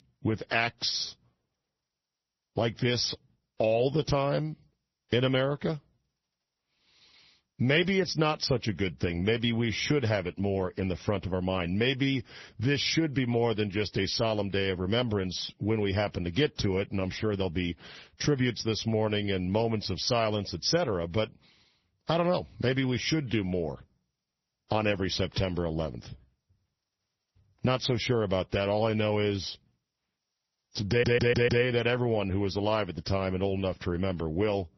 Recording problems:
garbled, watery; slightly; nothing above 6 kHz
high-pitched whine; very faint; throughout; 5.5 kHz, 50 dB below the speech
audio stuttering; at 31 s

